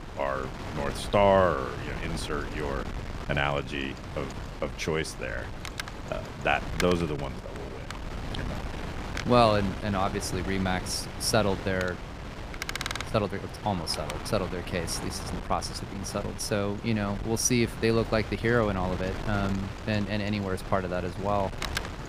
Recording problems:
wind noise on the microphone; heavy; 10 dB below the speech

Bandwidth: 15 kHz